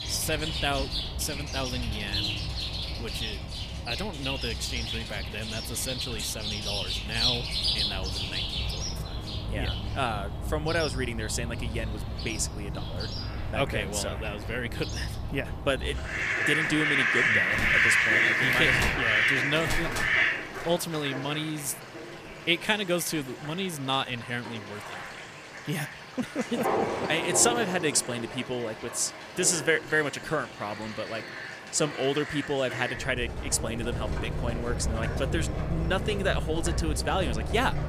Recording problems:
animal sounds; very loud; throughout; 1 dB above the speech

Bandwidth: 15 kHz